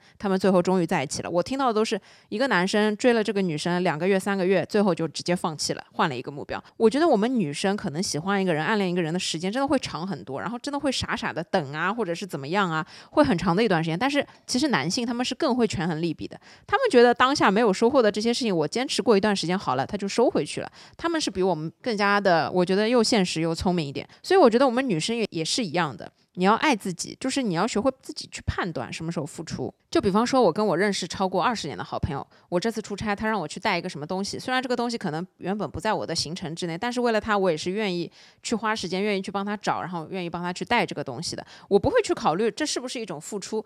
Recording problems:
none

